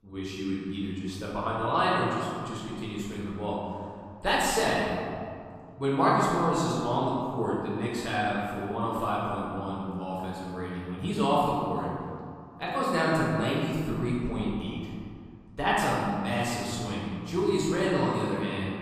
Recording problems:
room echo; strong; dies away in 2.1 s
off-mic speech; far

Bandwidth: 14.5 kHz